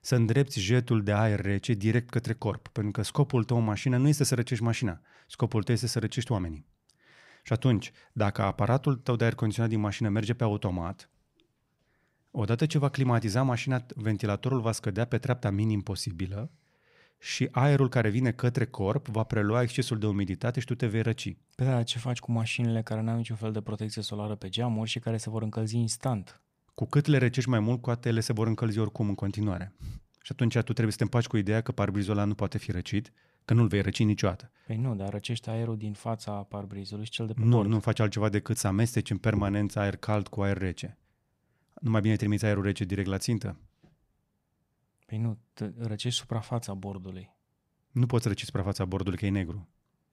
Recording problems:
none

